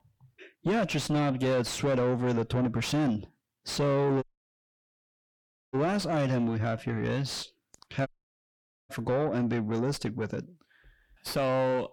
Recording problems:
distortion; heavy; 6 dB below the speech
audio cutting out; at 4 s for 1.5 s and at 8 s for 1 s

